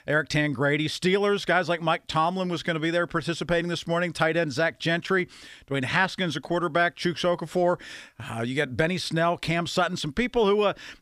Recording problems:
none

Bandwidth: 15 kHz